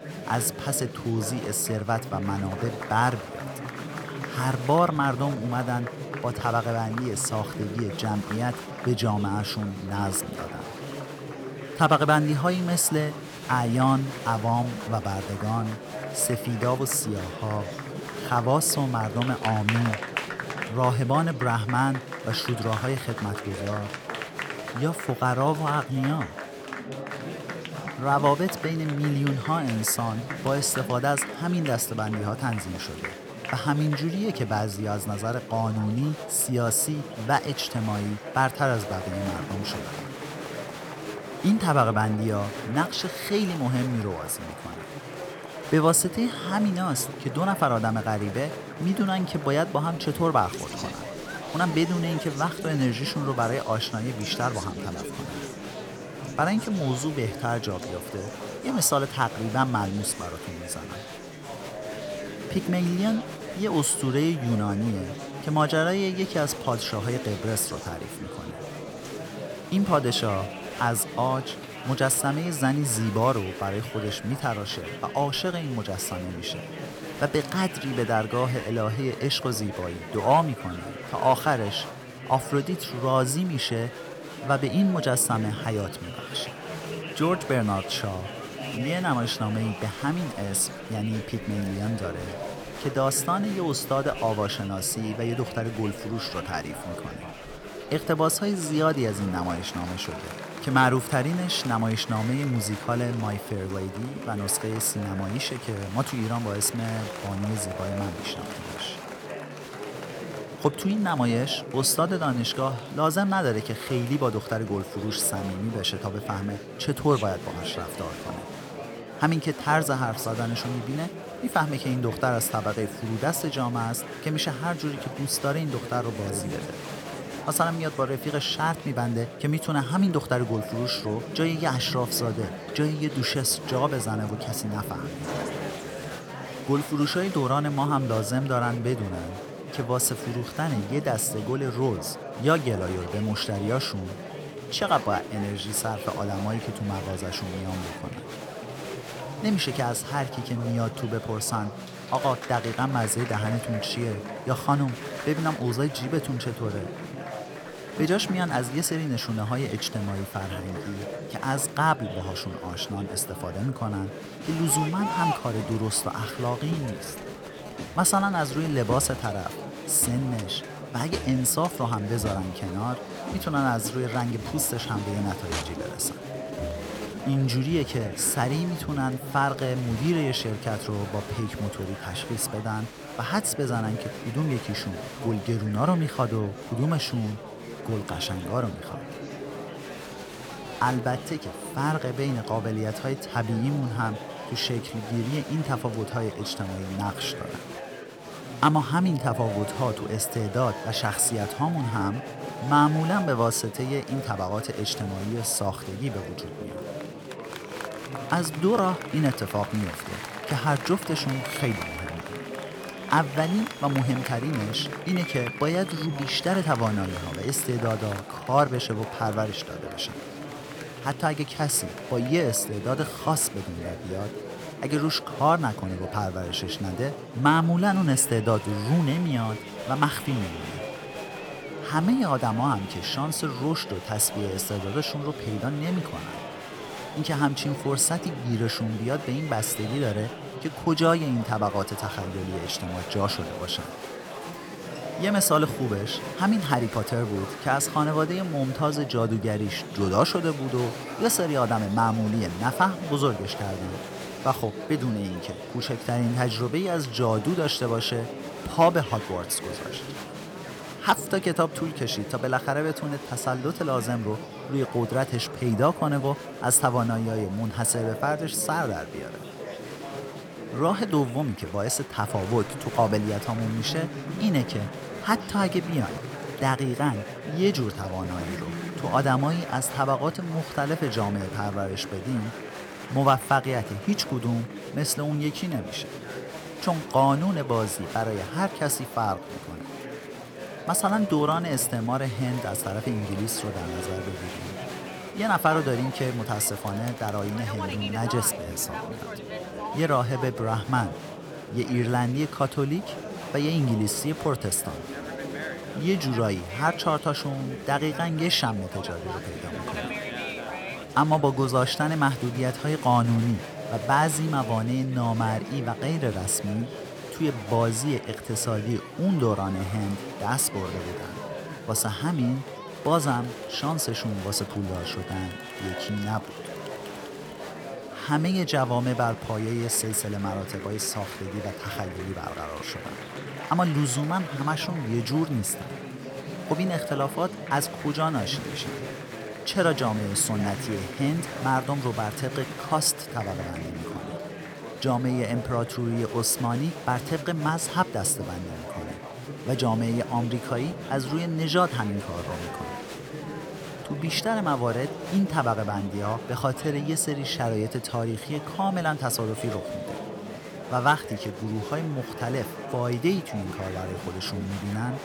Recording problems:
murmuring crowd; loud; throughout; 9 dB below the speech

